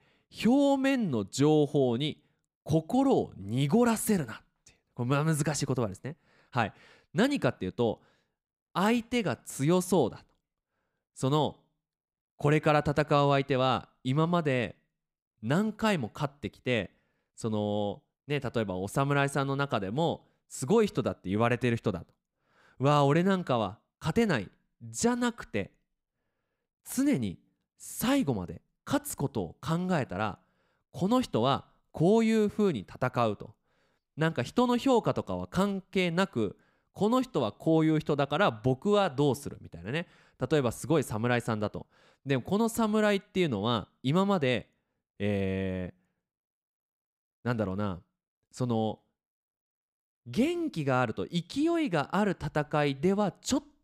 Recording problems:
none

